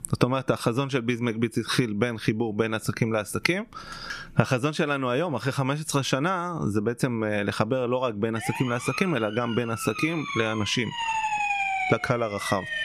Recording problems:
squashed, flat; somewhat
siren; loud; from 8.5 s on; peak 2 dB above the speech

